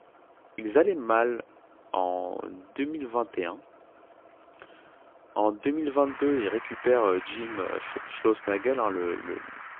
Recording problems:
phone-call audio; poor line; nothing above 3.5 kHz
traffic noise; noticeable; throughout; 10 dB below the speech

